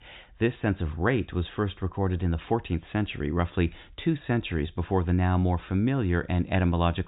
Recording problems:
high frequencies cut off; severe; nothing above 4 kHz

